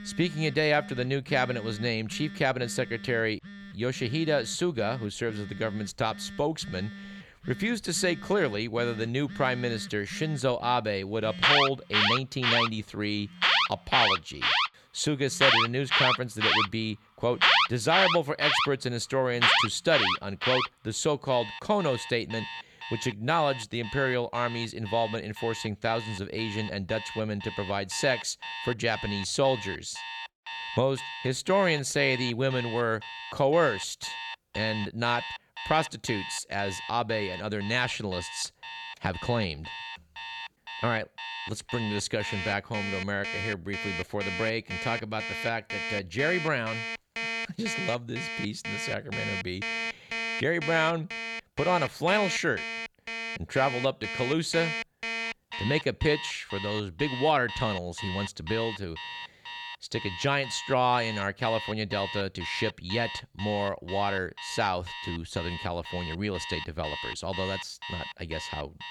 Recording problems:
alarms or sirens; loud; throughout; 2 dB below the speech

